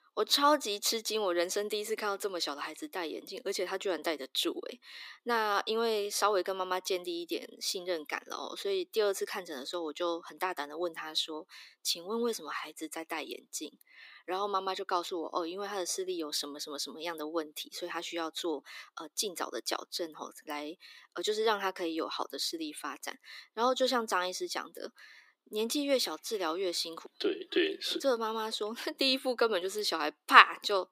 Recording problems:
thin; somewhat; fading below 300 Hz

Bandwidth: 15.5 kHz